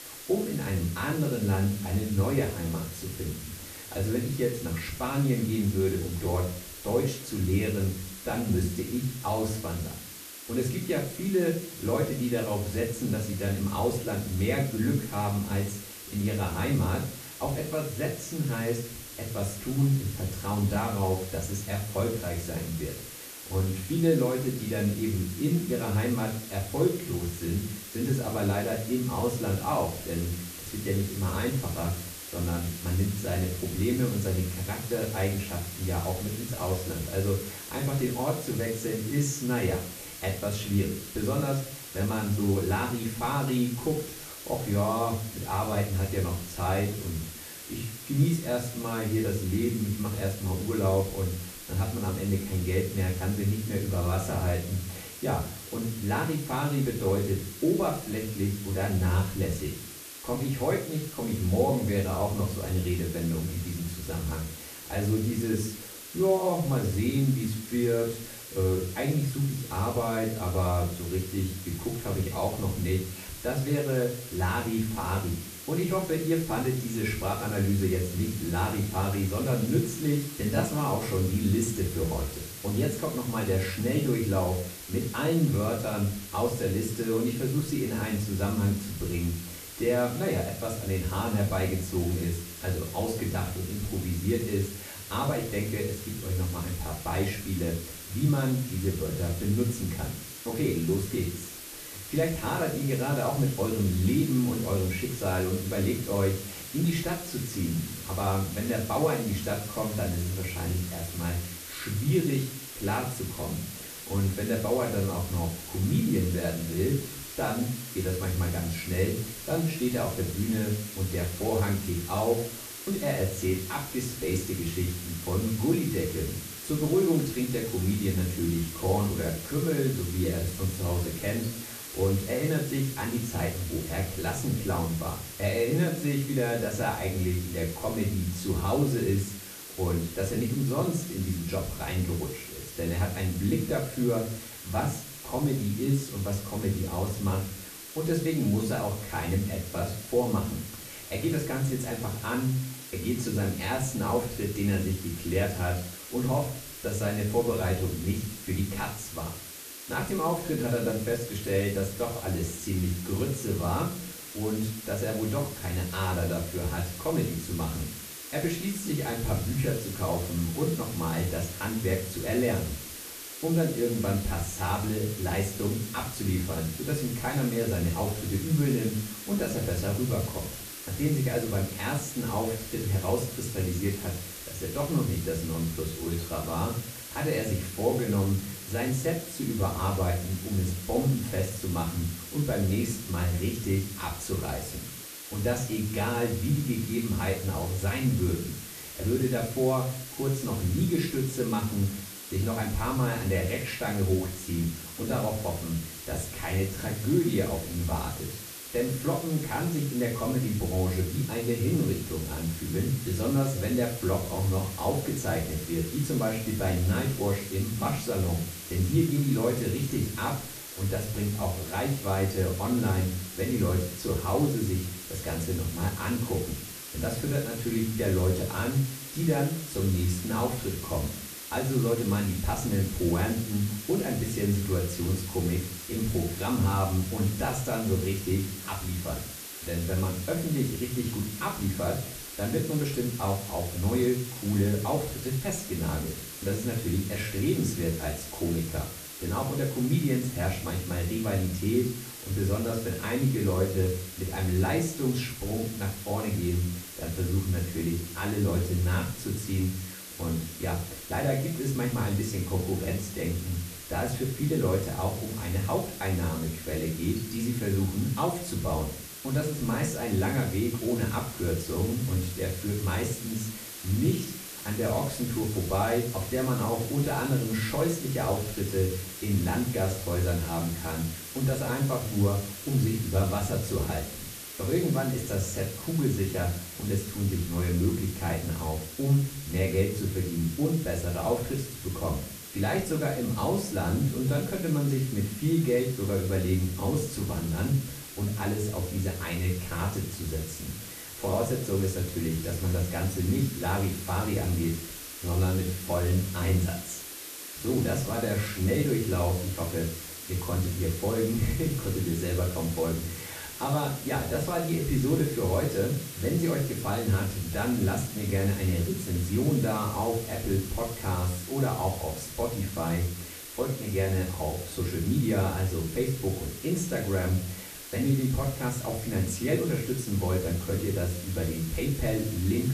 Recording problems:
off-mic speech; far
room echo; slight; dies away in 0.4 s
hiss; loud; throughout; 10 dB below the speech

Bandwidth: 14.5 kHz